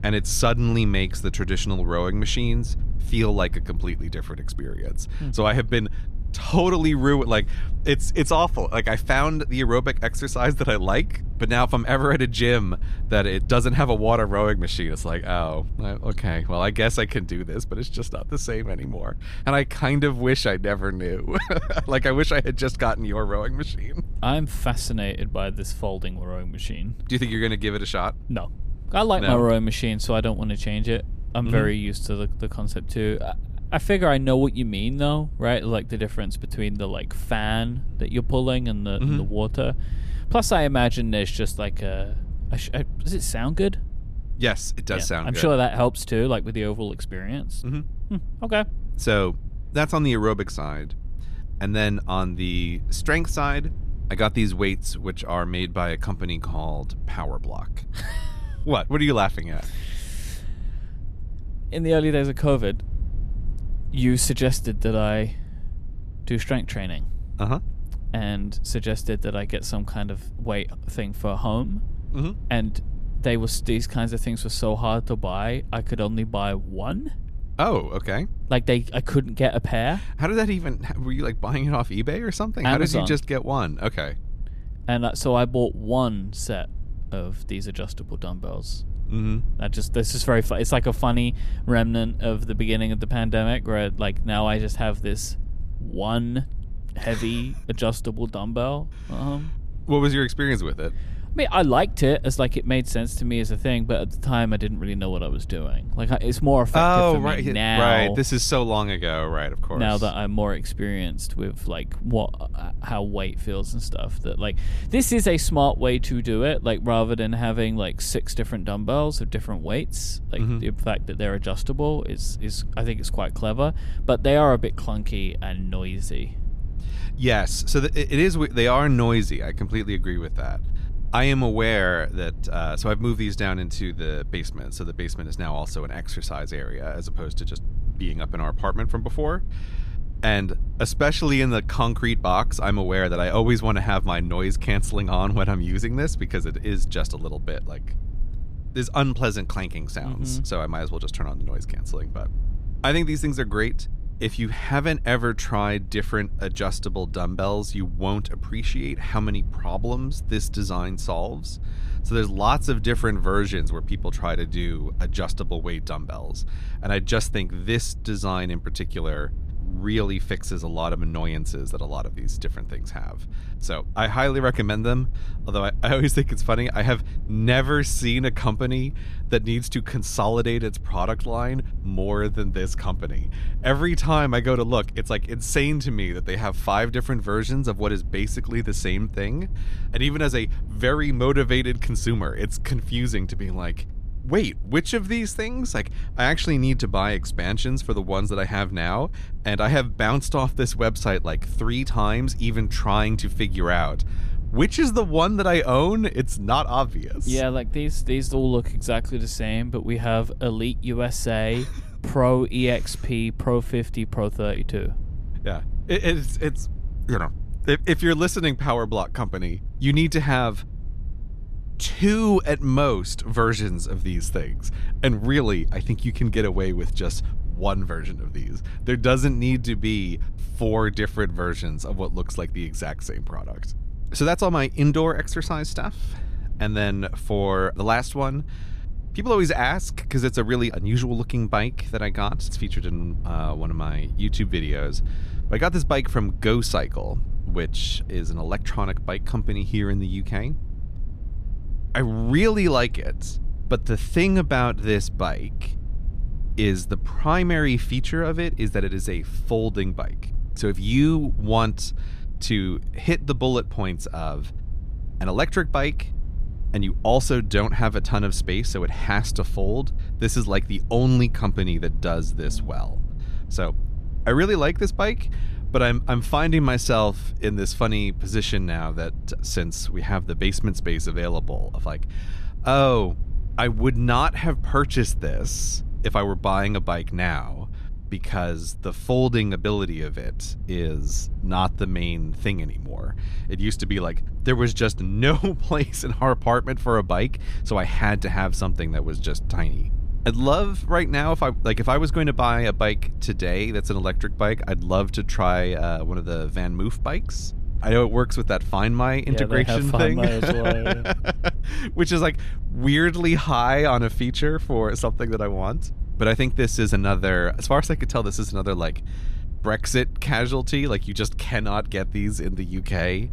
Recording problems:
low rumble; faint; throughout; 25 dB below the speech

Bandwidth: 14.5 kHz